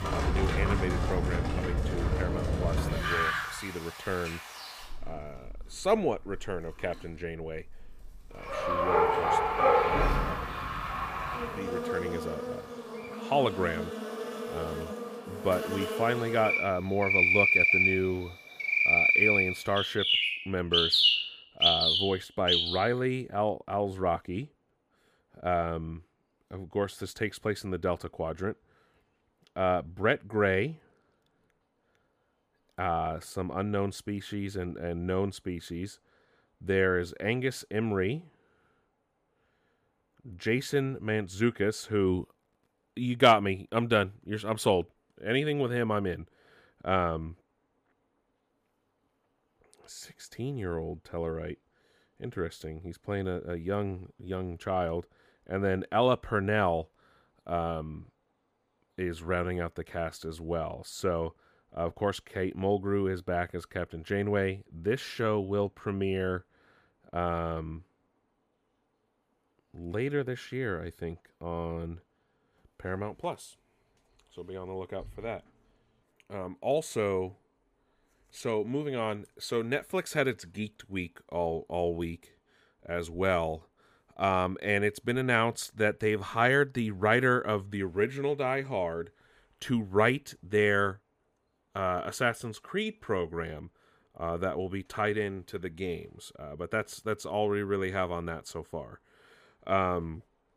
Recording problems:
animal sounds; very loud; until 23 s; 4 dB above the speech

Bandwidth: 15 kHz